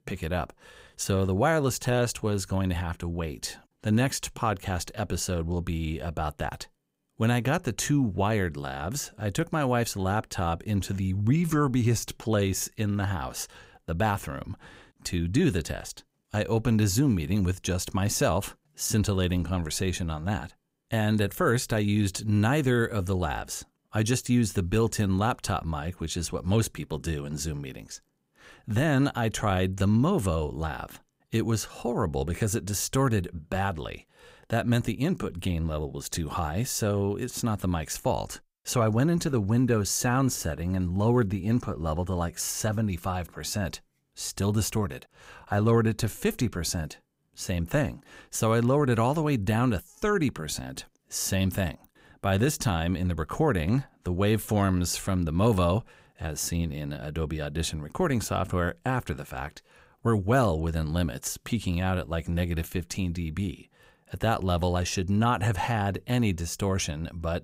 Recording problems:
none

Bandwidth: 15.5 kHz